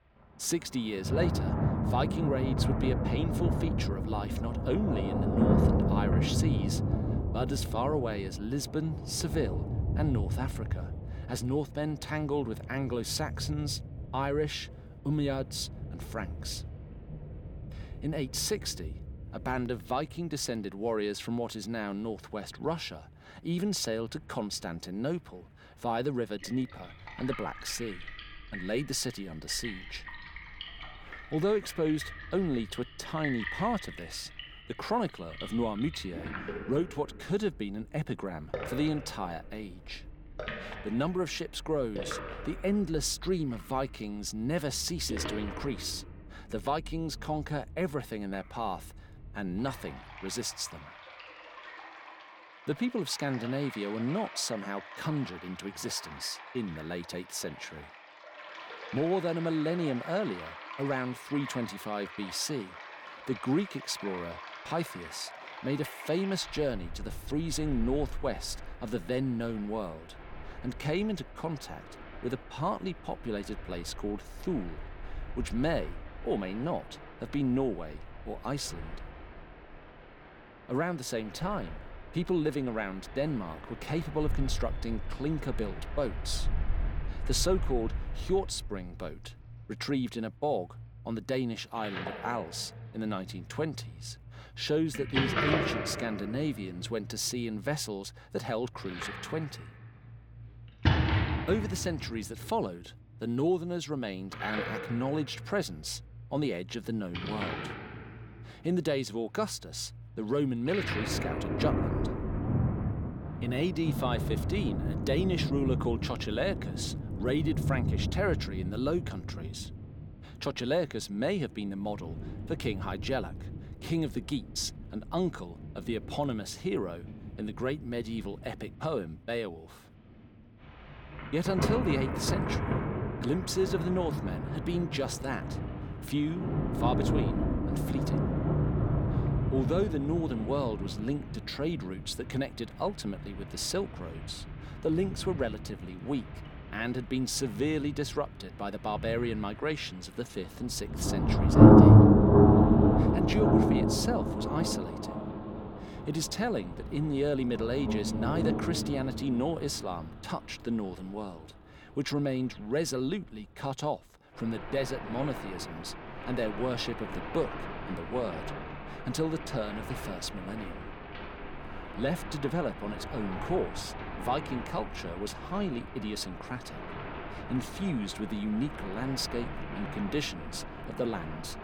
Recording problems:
rain or running water; very loud; throughout; 2 dB above the speech

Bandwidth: 17.5 kHz